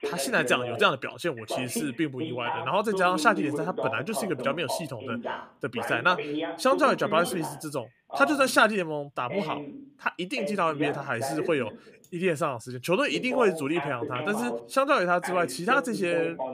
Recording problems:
voice in the background; loud; throughout; 8 dB below the speech

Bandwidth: 15 kHz